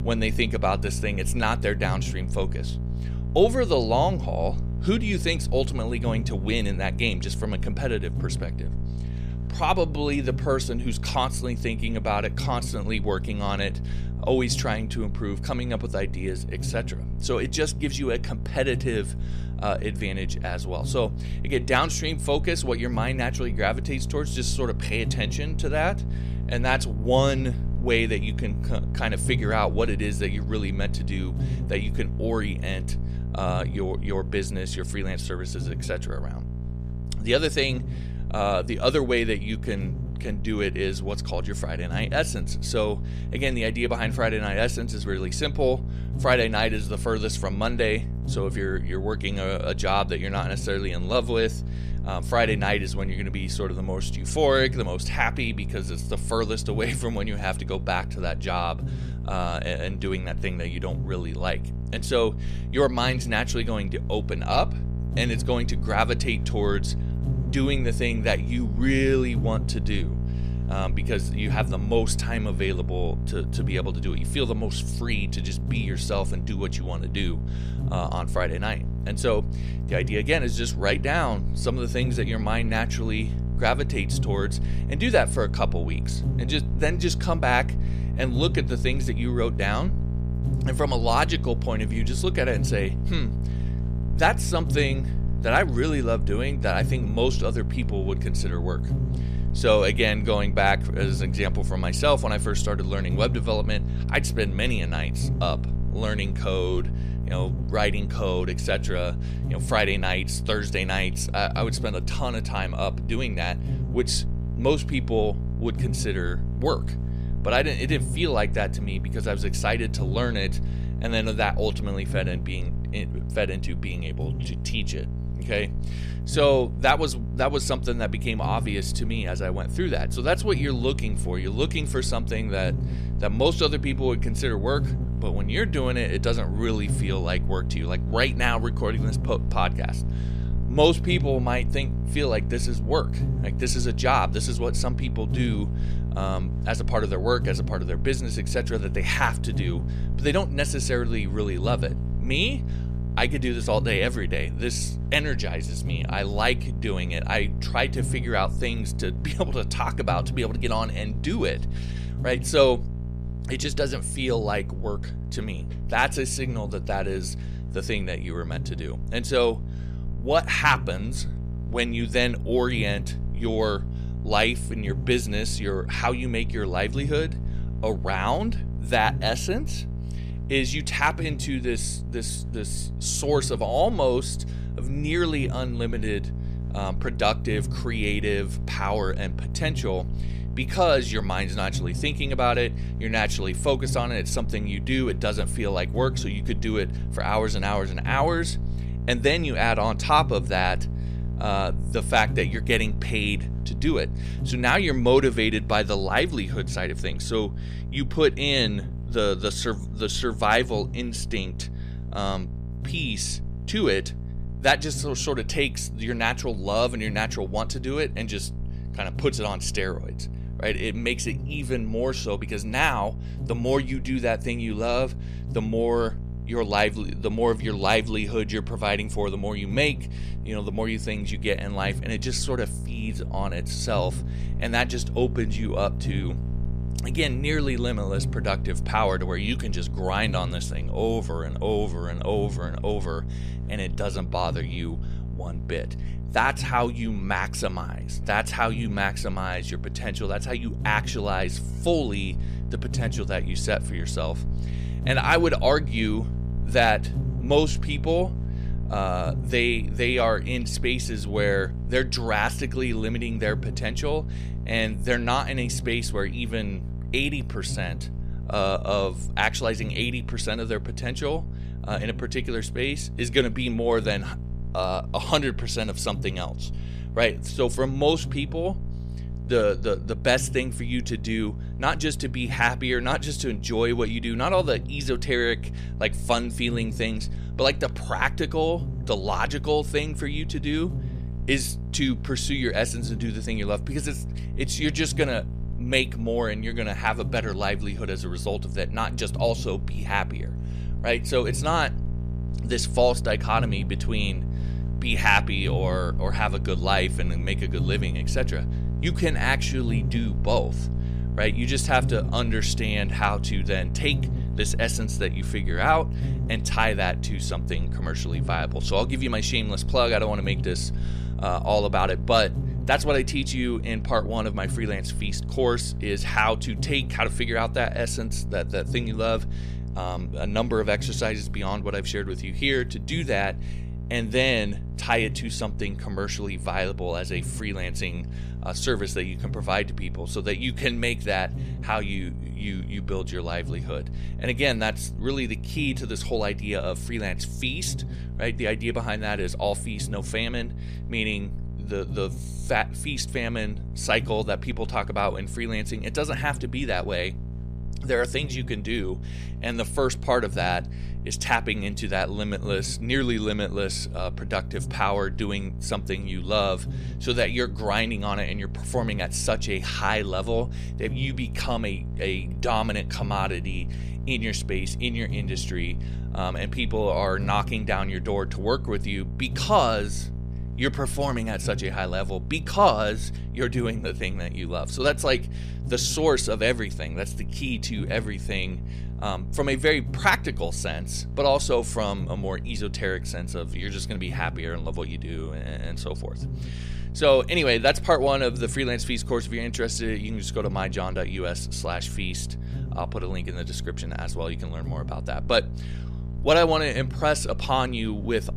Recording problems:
electrical hum; noticeable; throughout; 60 Hz, 15 dB below the speech

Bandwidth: 14.5 kHz